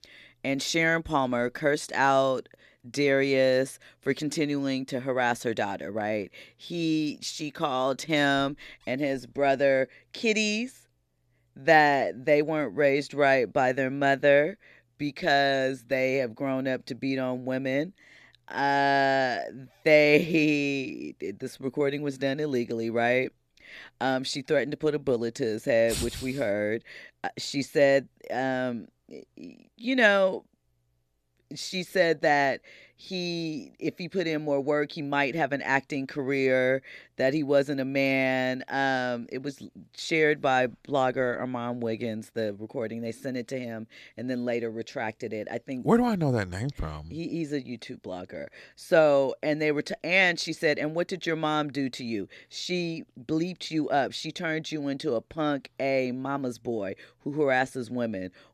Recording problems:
none

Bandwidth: 14 kHz